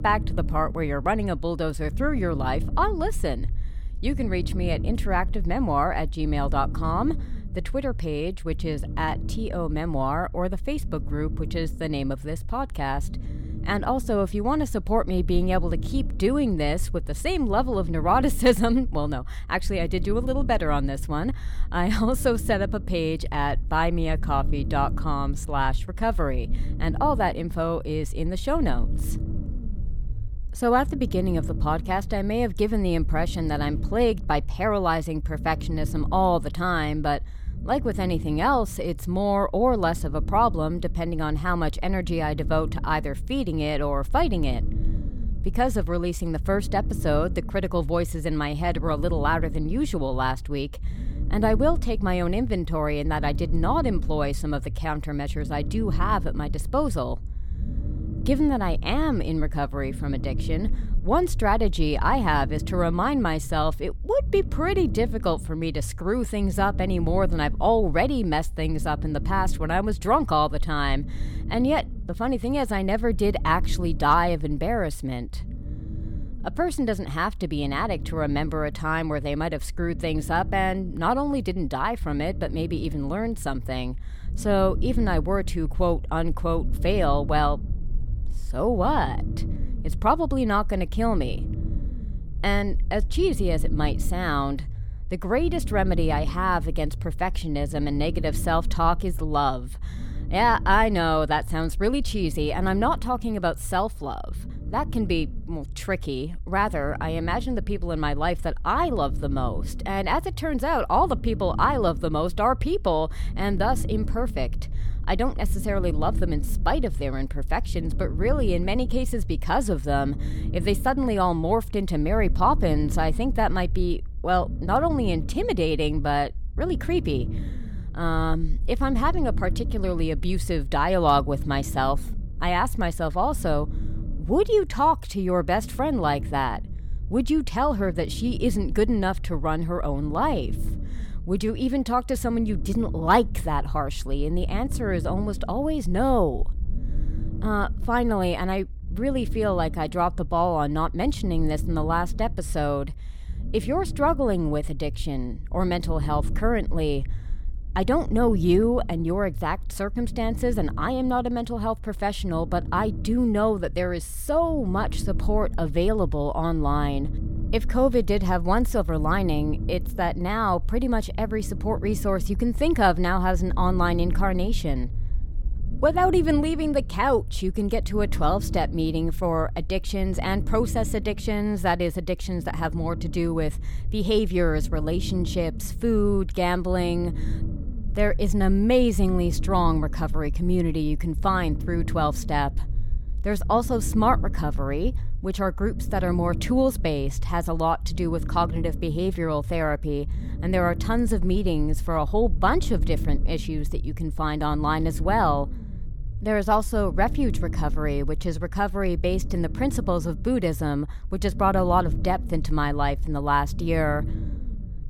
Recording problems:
low rumble; noticeable; throughout; 20 dB below the speech

